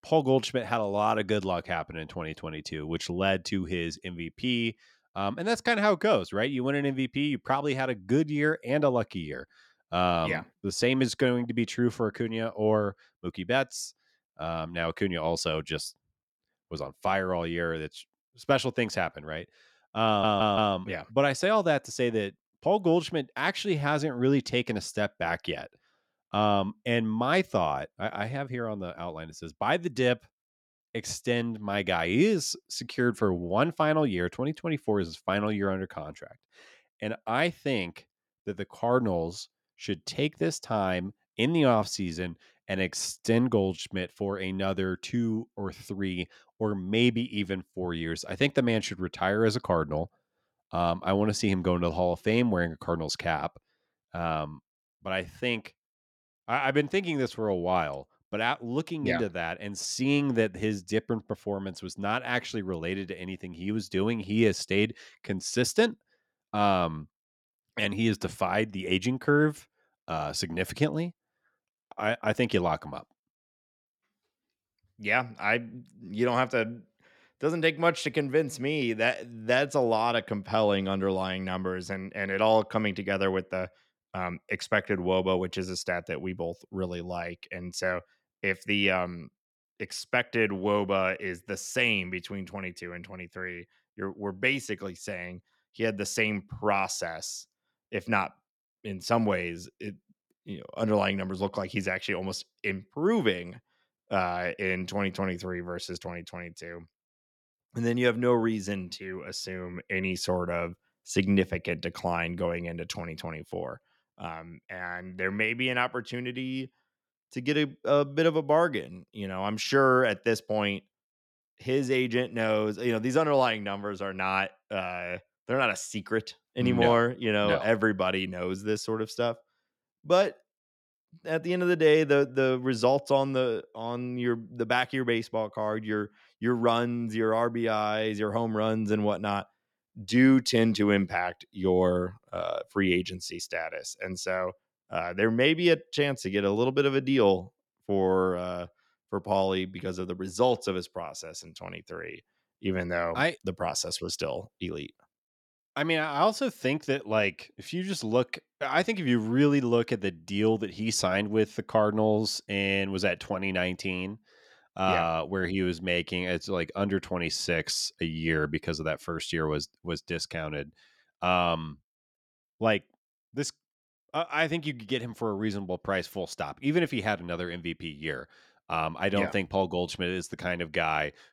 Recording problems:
audio stuttering; at 20 s

